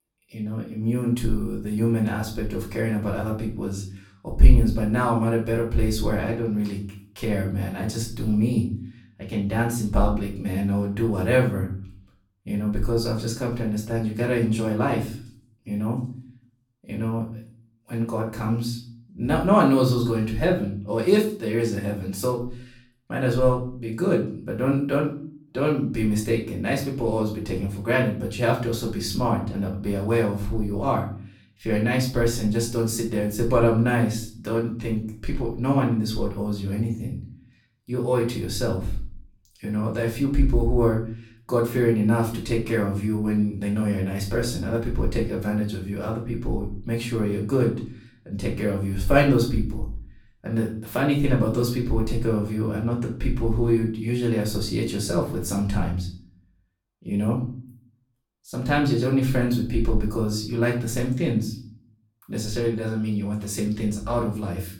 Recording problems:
off-mic speech; far
room echo; slight; dies away in 0.4 s

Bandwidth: 17 kHz